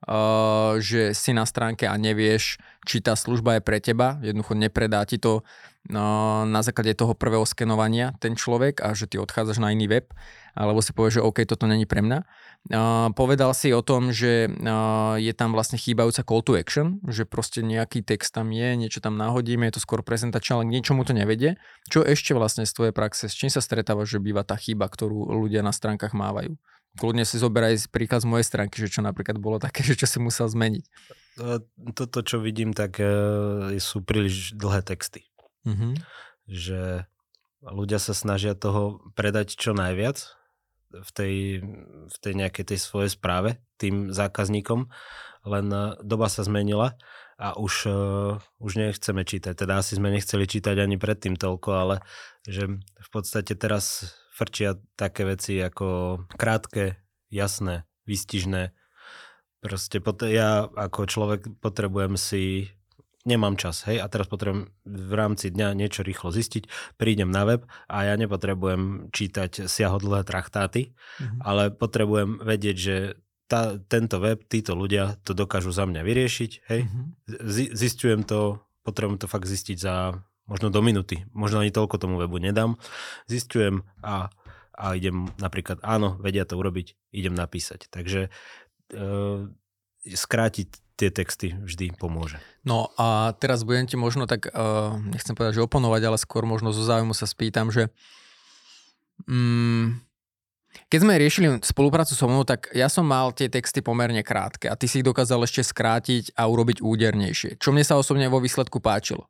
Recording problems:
none

